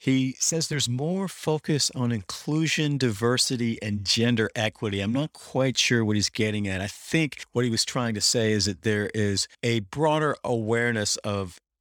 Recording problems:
none

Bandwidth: 18.5 kHz